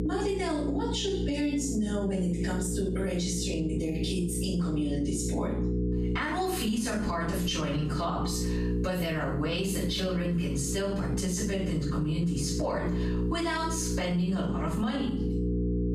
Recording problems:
off-mic speech; far
room echo; noticeable; dies away in 0.5 s
squashed, flat; somewhat
electrical hum; loud; throughout; 60 Hz, 7 dB below the speech

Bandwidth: 14.5 kHz